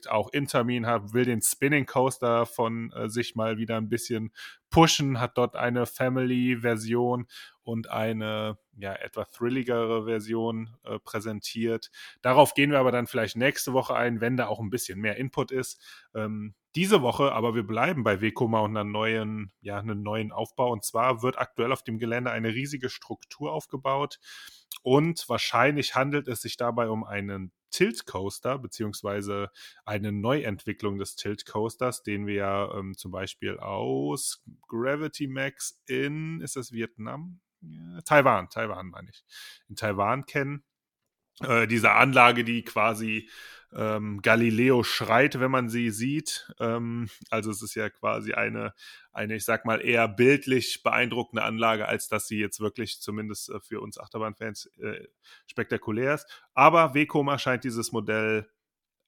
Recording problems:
none

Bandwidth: 18 kHz